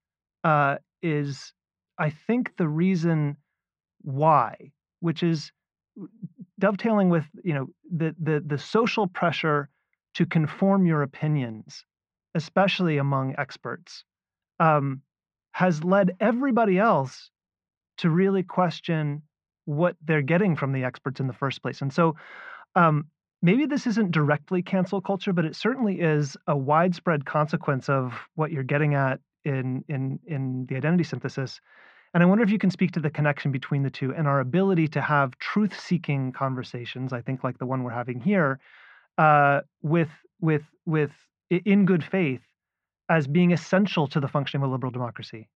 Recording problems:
muffled; very; fading above 2 kHz

